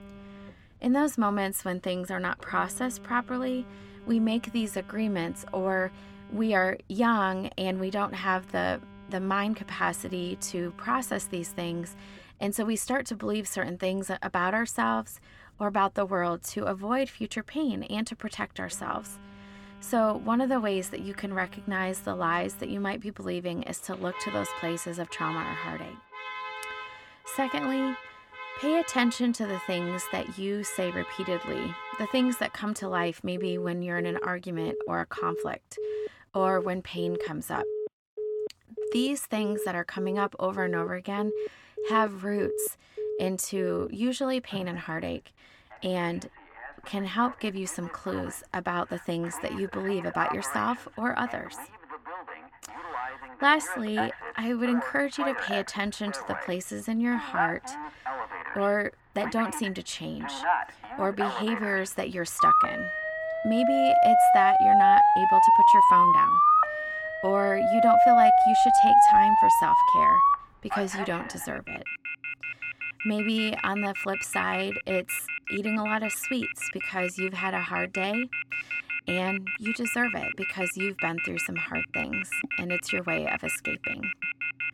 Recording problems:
alarms or sirens; very loud; throughout; 4 dB above the speech

